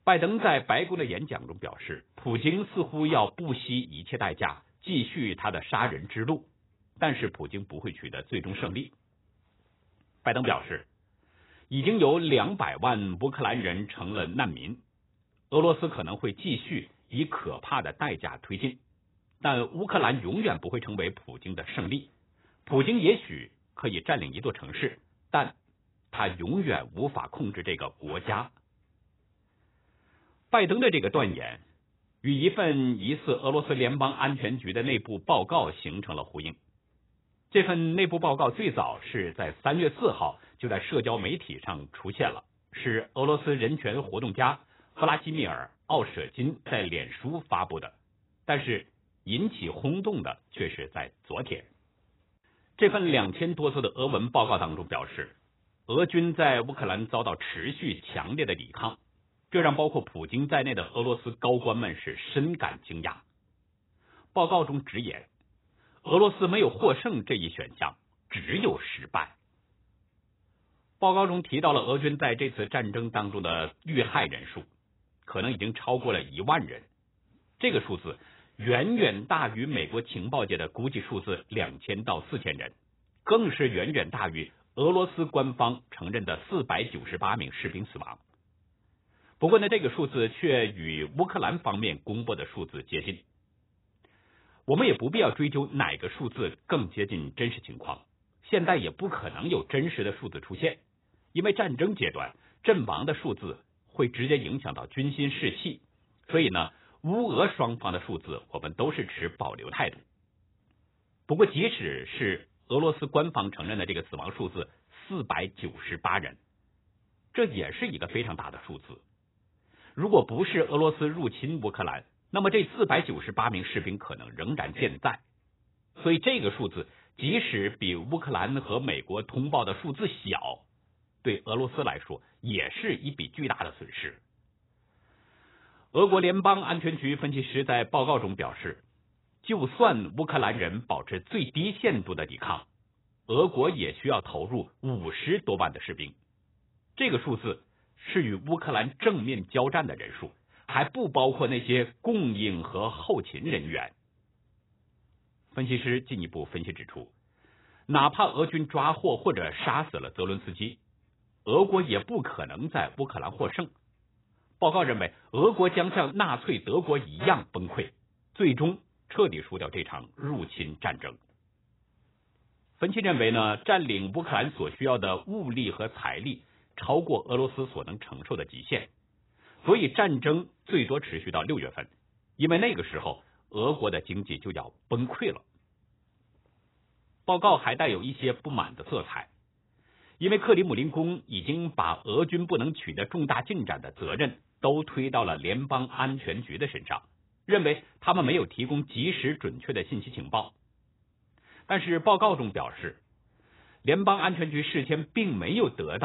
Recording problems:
garbled, watery; badly; nothing above 4 kHz
abrupt cut into speech; at the end

